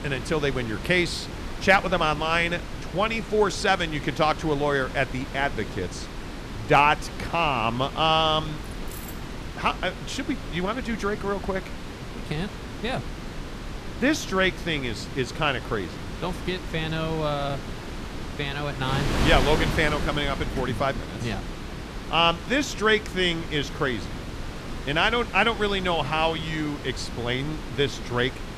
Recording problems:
wind noise on the microphone; occasional gusts; 10 dB below the speech
jangling keys; faint; at 8.5 s; peak 15 dB below the speech

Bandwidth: 14.5 kHz